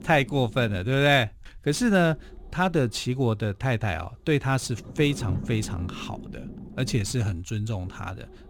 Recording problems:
low rumble; noticeable; throughout; 20 dB below the speech

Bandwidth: 18 kHz